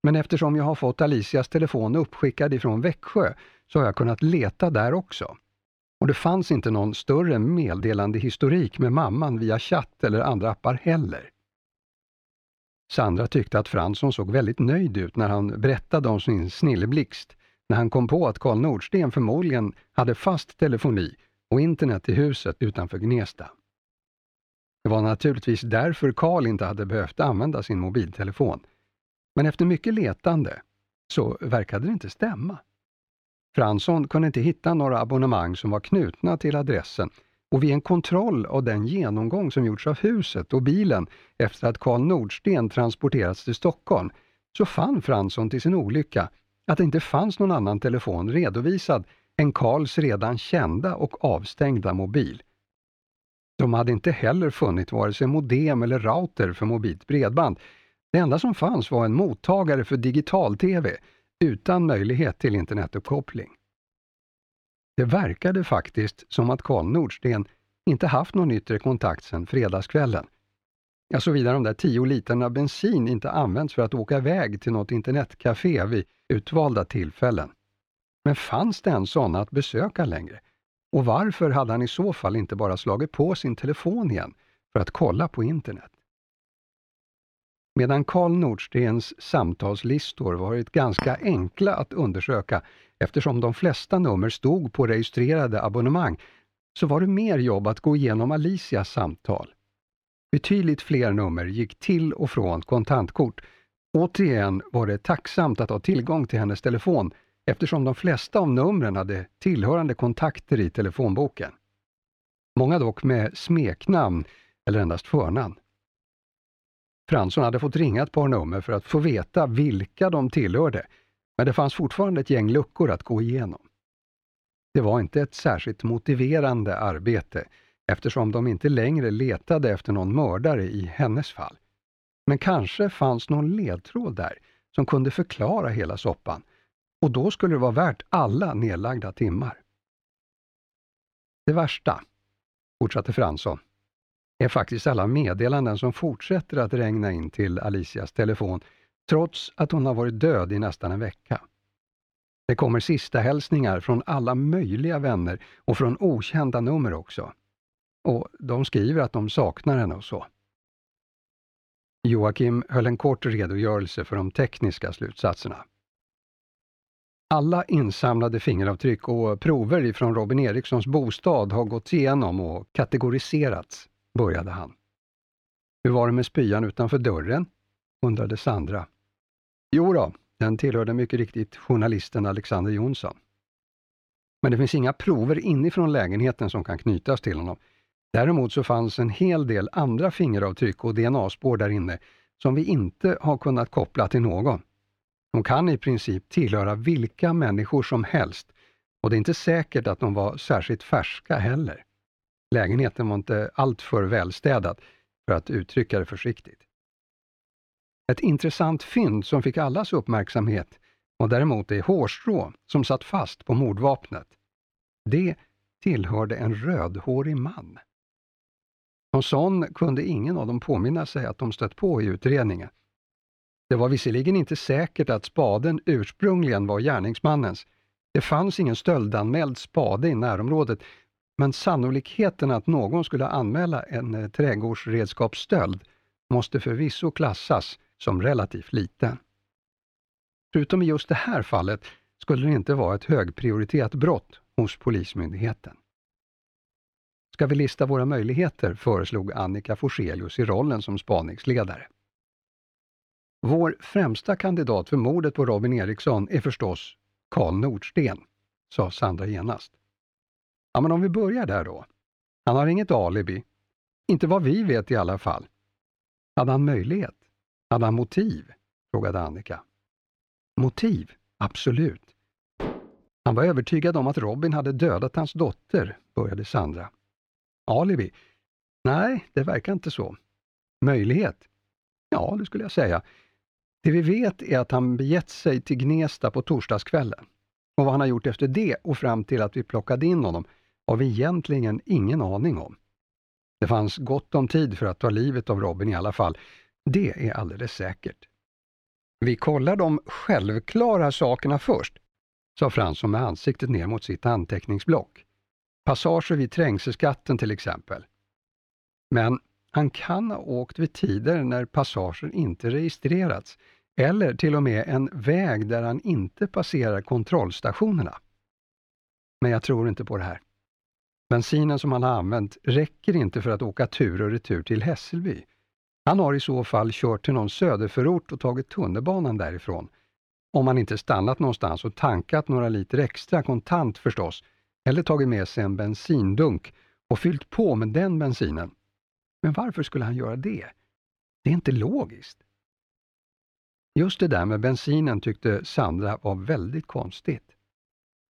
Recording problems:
muffled; slightly; fading above 4 kHz
clattering dishes; noticeable; at 1:31 and at 4:33; peak 7 dB below the speech

